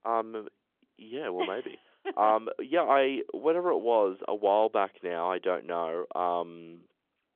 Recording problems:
phone-call audio; nothing above 3.5 kHz

